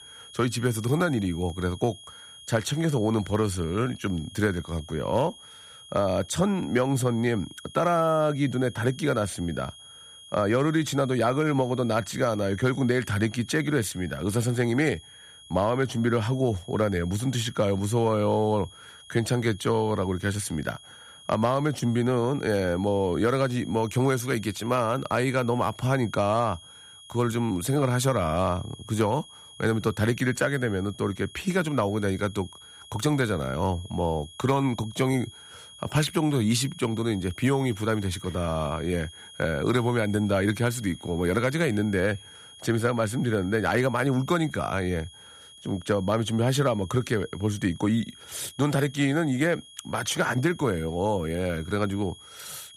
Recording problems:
high-pitched whine; noticeable; throughout; 3.5 kHz, 20 dB below the speech

